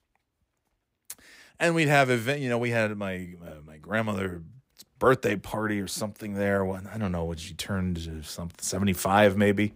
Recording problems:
none

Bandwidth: 15.5 kHz